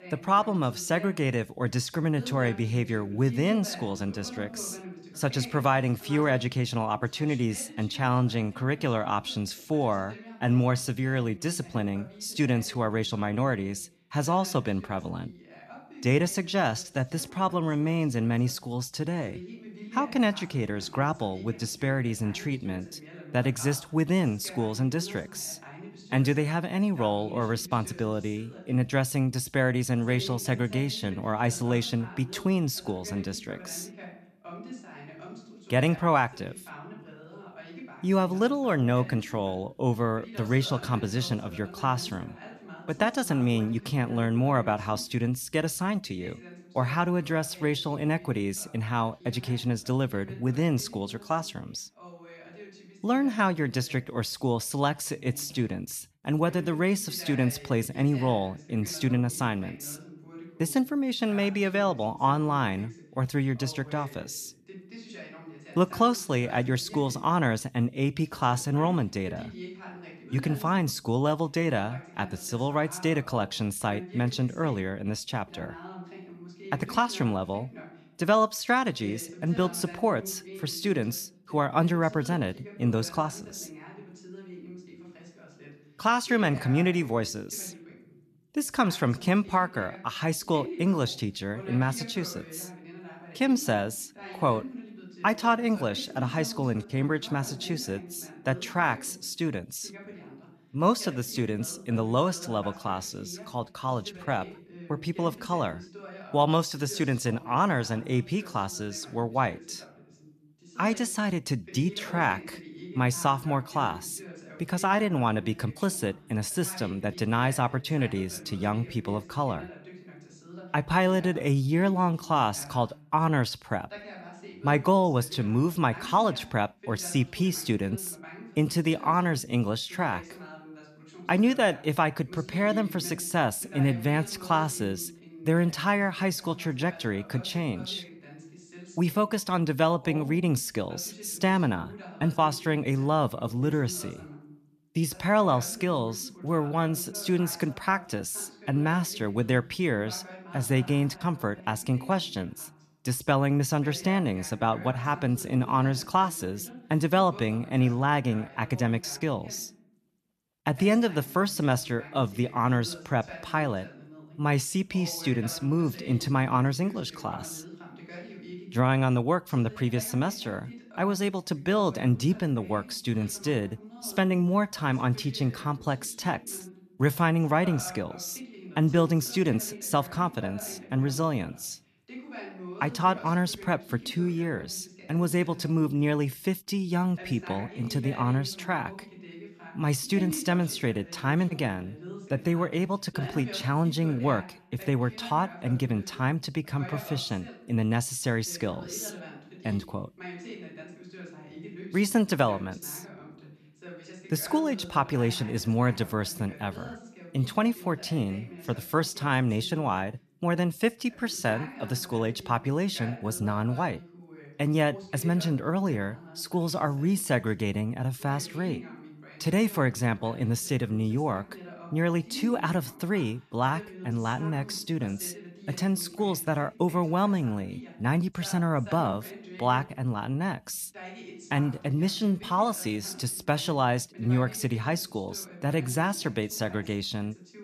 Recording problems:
voice in the background; noticeable; throughout; 15 dB below the speech

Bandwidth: 14 kHz